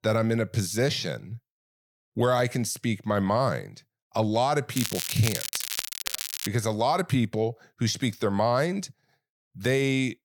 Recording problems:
crackling; loud; from 5 to 6.5 s; 4 dB below the speech

